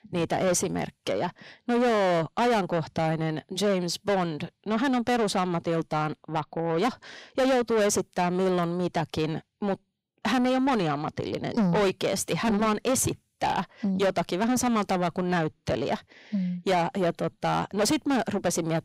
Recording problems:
distortion; heavy; 7 dB below the speech

